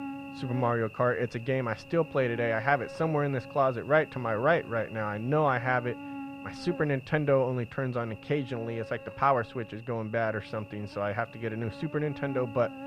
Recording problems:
muffled; very; fading above 2 kHz
electrical hum; noticeable; throughout; 50 Hz, 15 dB below the speech

